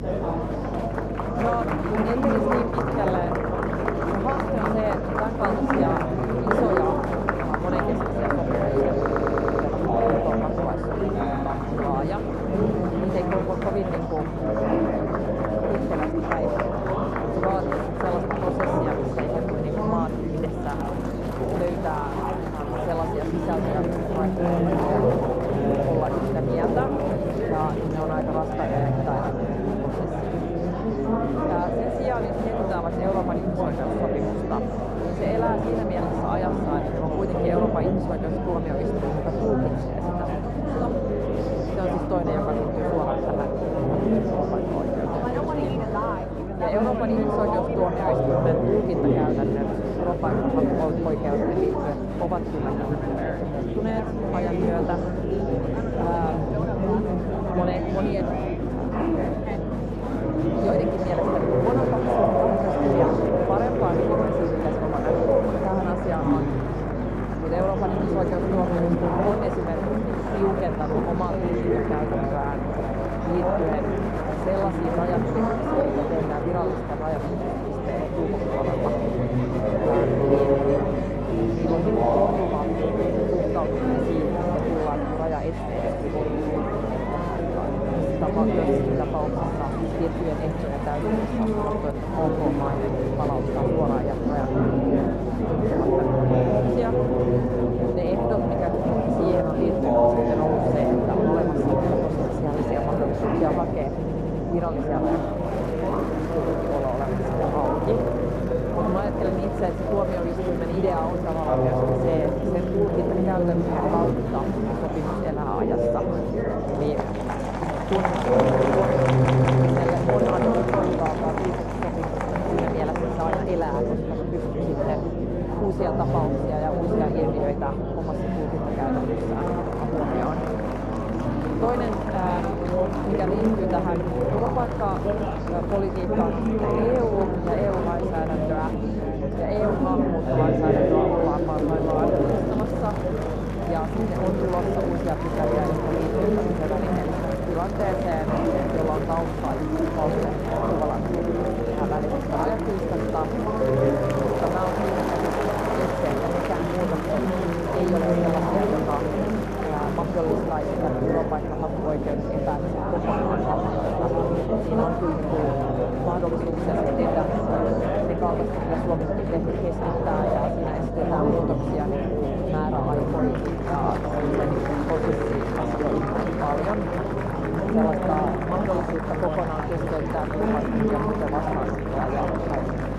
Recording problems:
muffled; very; fading above 1.5 kHz
murmuring crowd; very loud; throughout; 5 dB above the speech
electrical hum; noticeable; throughout; 50 Hz, 15 dB below the speech
audio stuttering; at 9 s, at 1:44 and at 1:59

